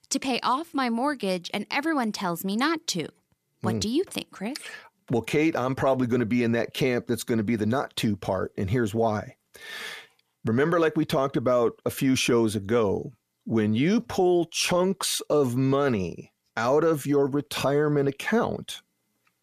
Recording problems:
none

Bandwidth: 14.5 kHz